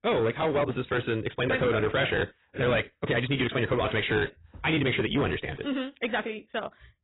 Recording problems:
garbled, watery; badly; nothing above 4 kHz
wrong speed, natural pitch; too fast; 1.5 times normal speed
distortion; slight; 11% of the sound clipped

